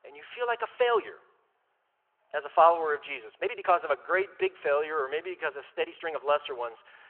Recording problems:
phone-call audio
uneven, jittery; strongly; from 0.5 to 6 s

